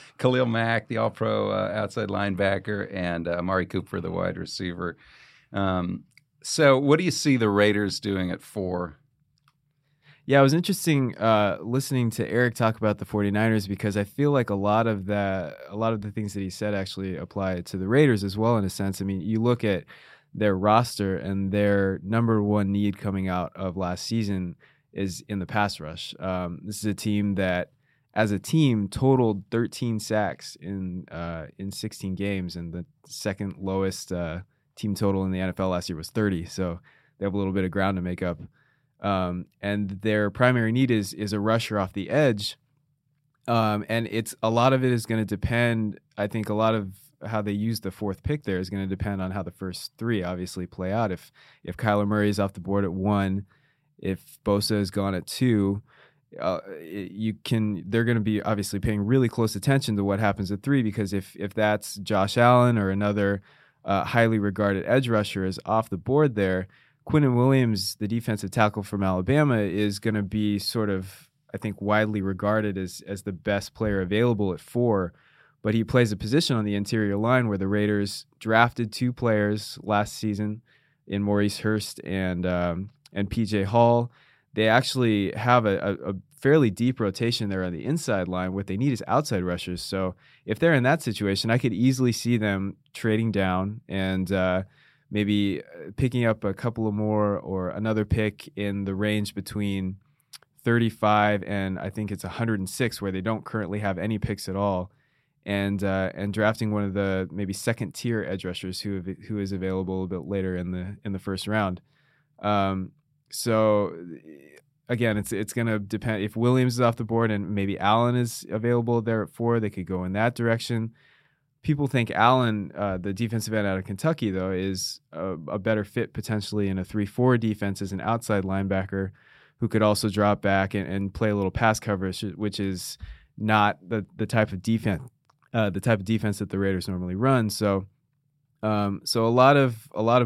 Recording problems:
abrupt cut into speech; at the end

